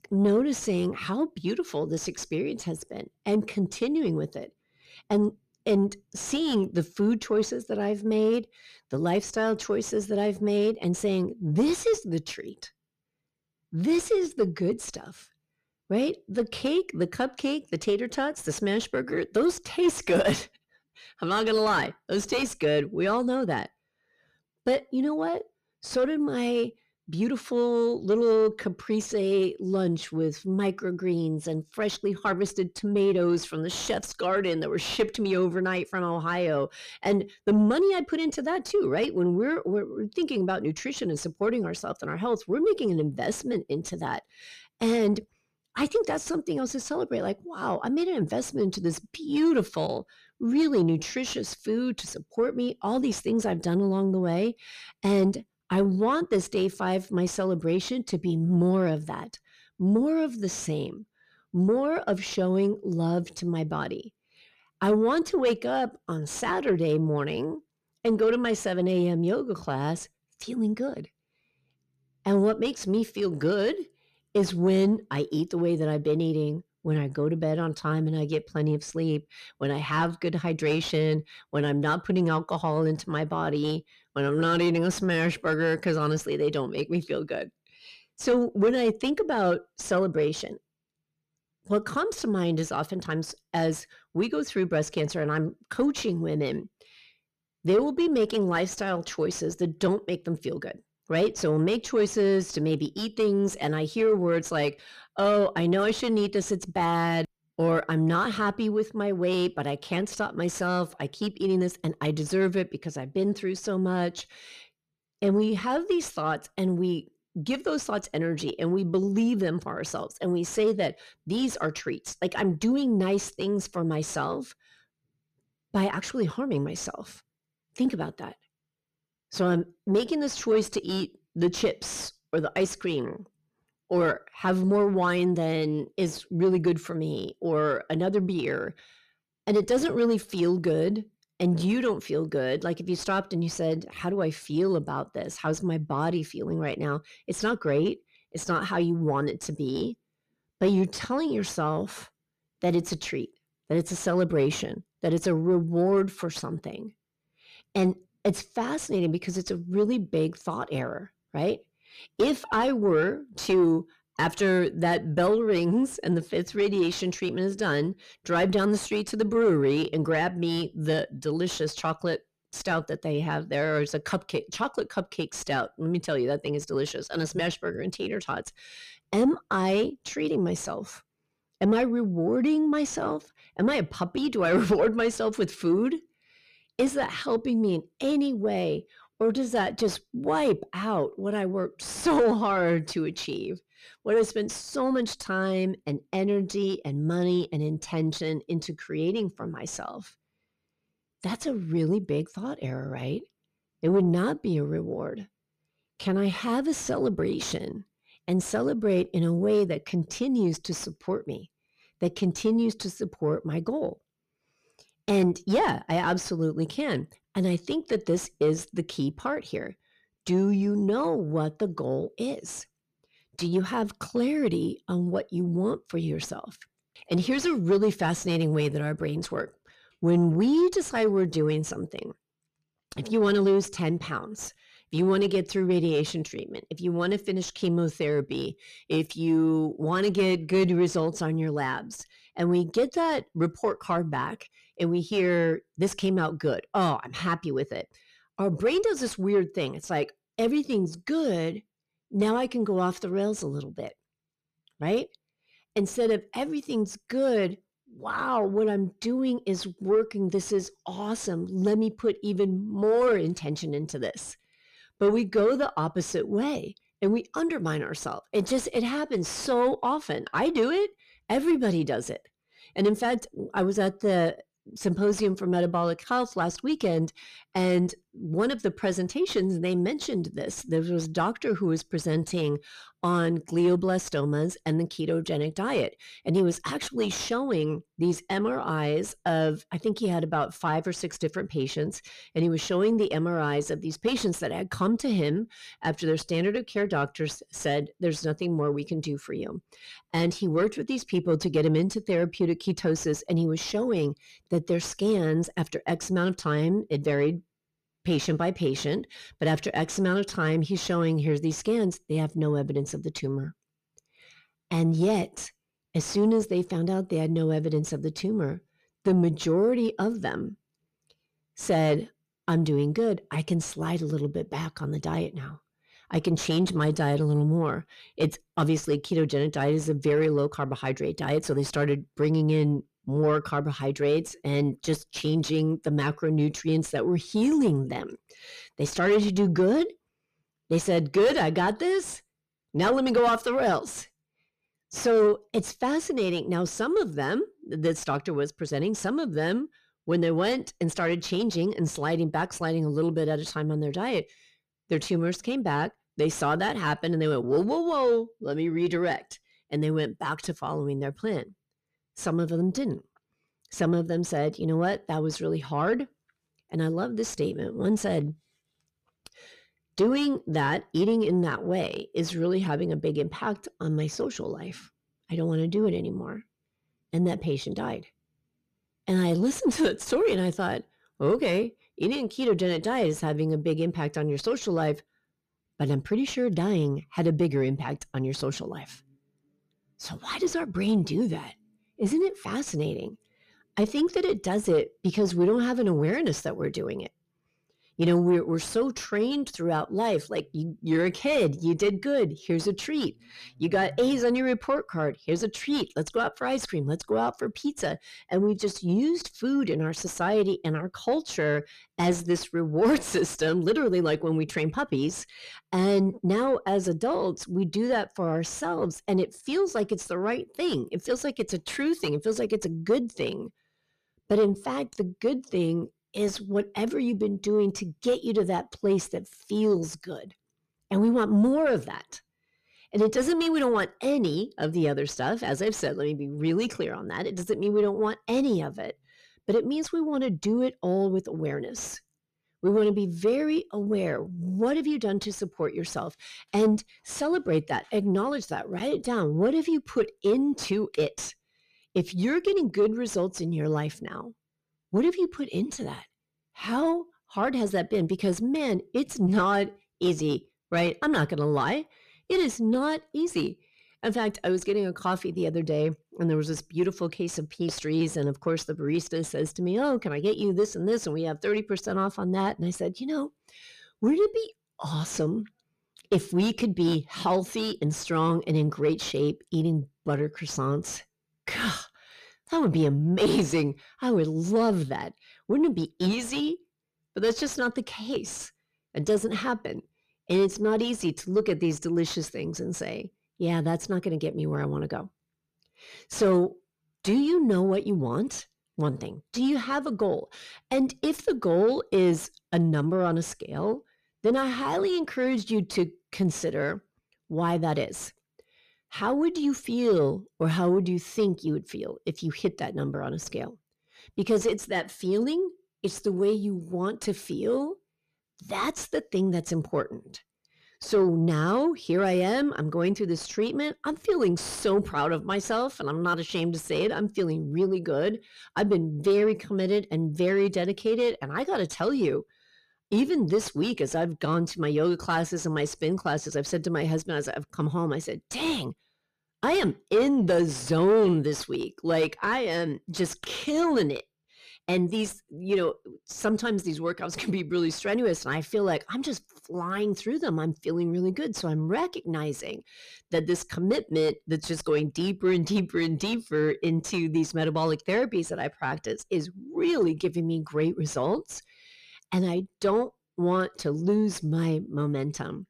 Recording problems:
distortion; slight; 10 dB below the speech

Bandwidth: 14.5 kHz